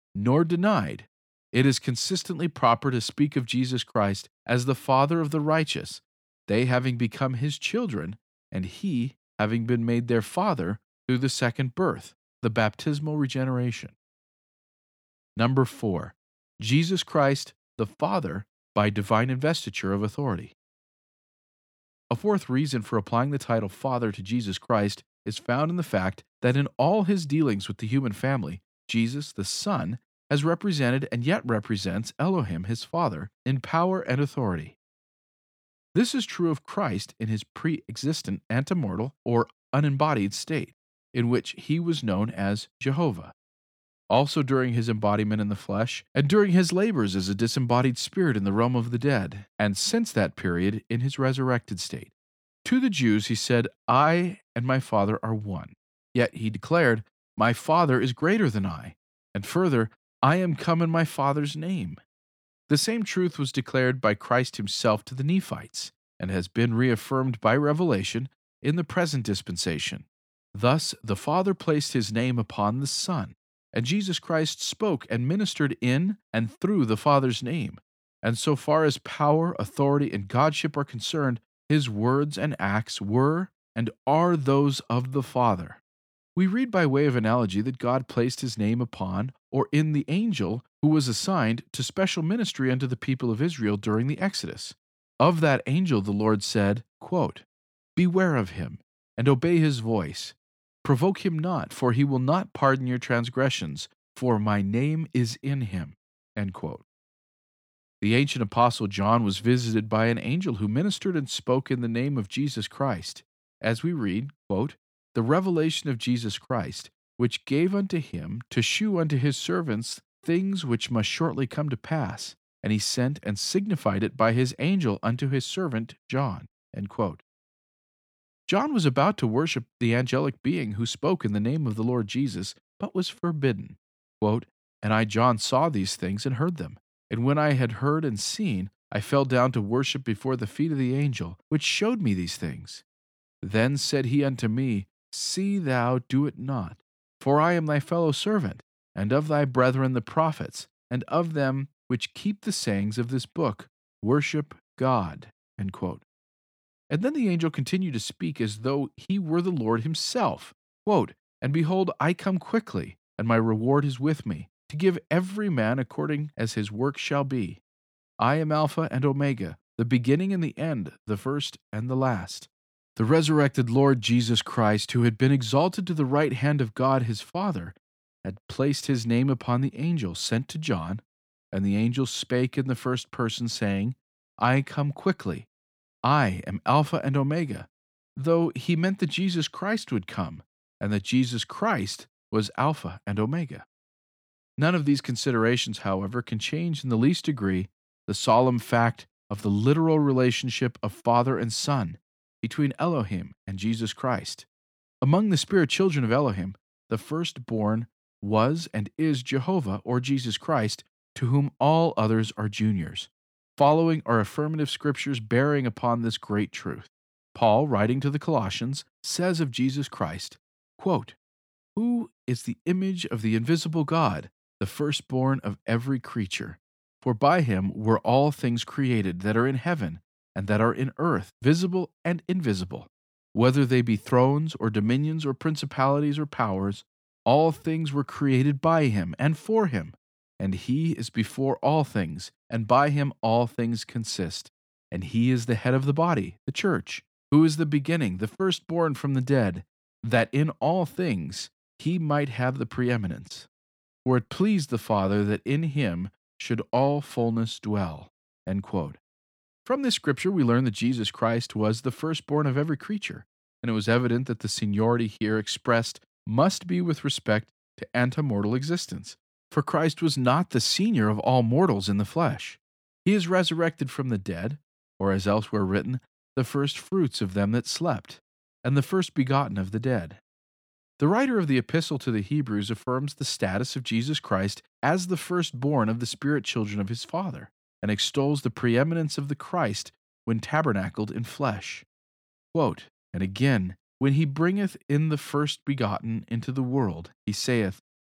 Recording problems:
none

